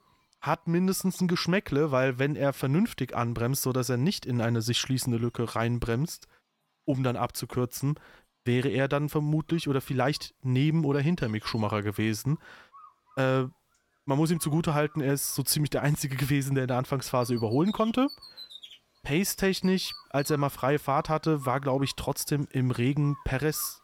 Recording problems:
animal sounds; faint; throughout; 20 dB below the speech

